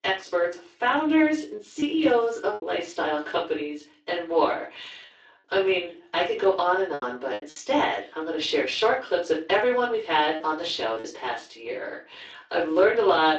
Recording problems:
off-mic speech; far
room echo; slight; dies away in 0.3 s
garbled, watery; slightly; nothing above 7.5 kHz
thin; very slightly; fading below 300 Hz
choppy; very; from 1.5 to 2.5 s, at 7 s and at 11 s; 5% of the speech affected

